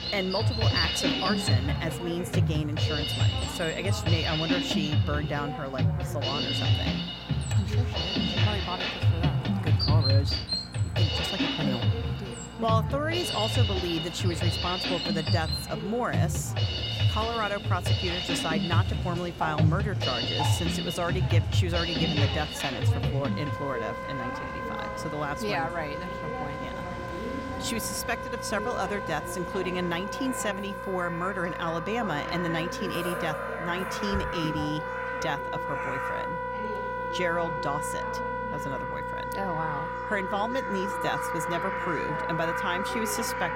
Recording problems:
background music; very loud; throughout; 3 dB above the speech
animal sounds; loud; throughout; 6 dB below the speech
voice in the background; noticeable; throughout; 10 dB below the speech
electrical hum; faint; throughout; 60 Hz, 20 dB below the speech
rain or running water; very faint; throughout; 15 dB below the speech

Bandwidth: 16 kHz